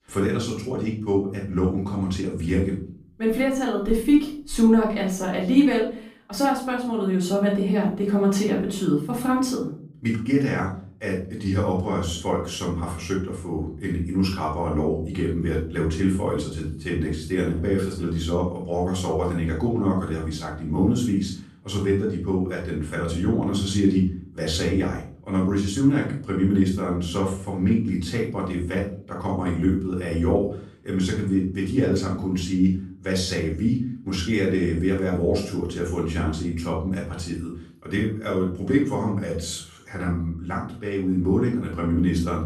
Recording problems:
off-mic speech; far
room echo; noticeable; dies away in 0.5 s

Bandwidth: 15 kHz